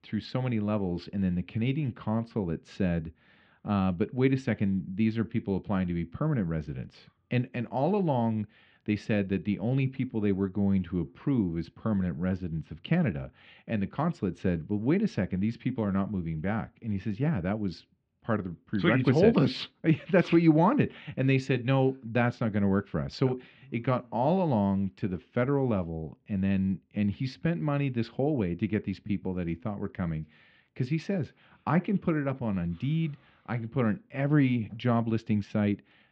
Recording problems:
muffled; very; fading above 3 kHz

